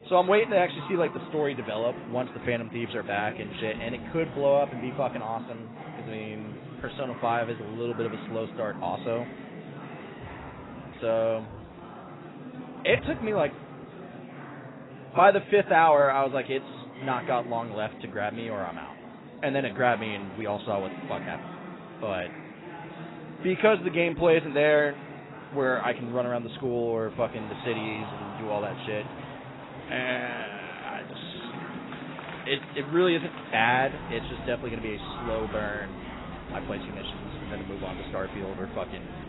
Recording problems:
garbled, watery; badly; nothing above 4 kHz
murmuring crowd; noticeable; throughout; 15 dB below the speech

